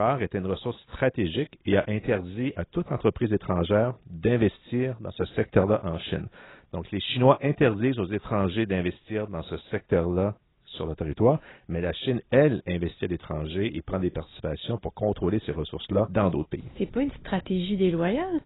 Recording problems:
garbled, watery; badly; nothing above 4 kHz
abrupt cut into speech; at the start

